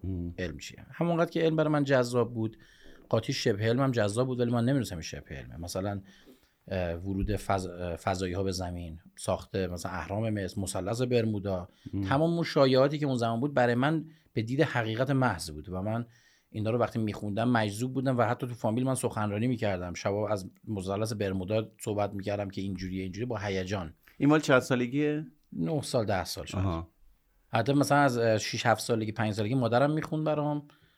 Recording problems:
none

